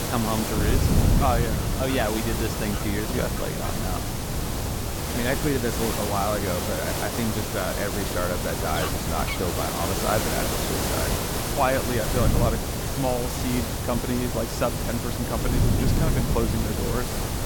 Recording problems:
hiss; loud; throughout; as loud as the speech
animal sounds; noticeable; throughout; 15 dB below the speech
wind noise on the microphone; occasional gusts; 10 dB below the speech

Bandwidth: 17.5 kHz